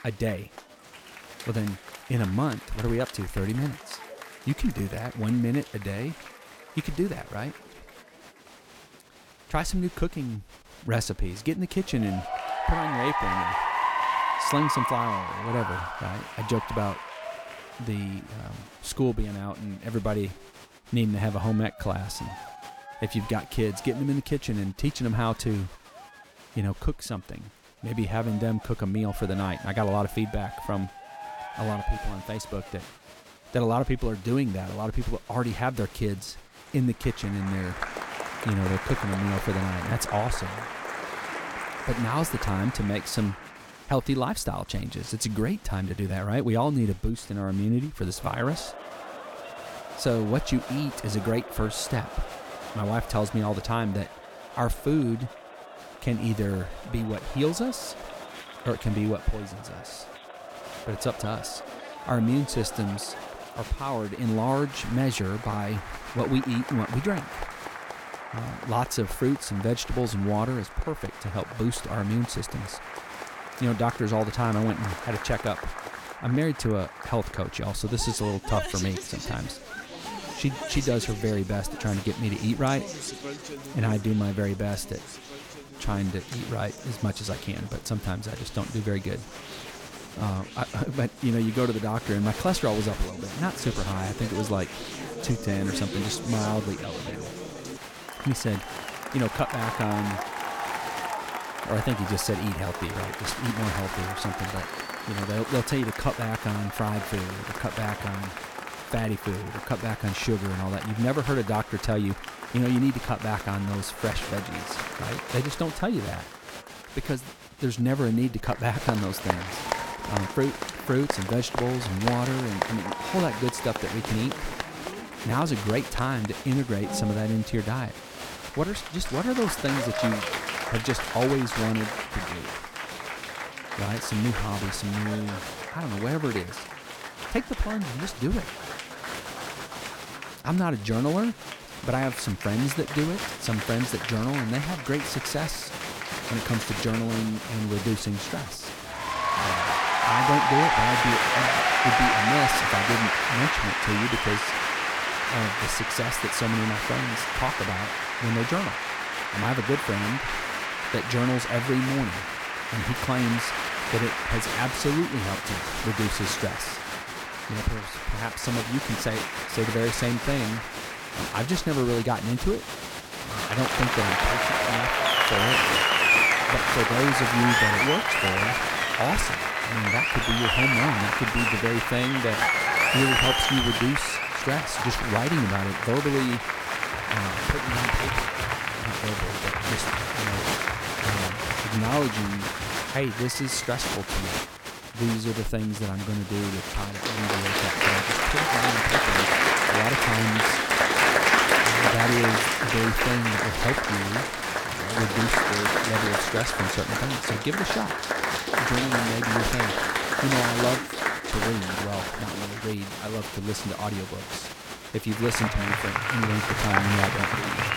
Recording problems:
crowd noise; very loud; throughout; 1 dB above the speech

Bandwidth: 17 kHz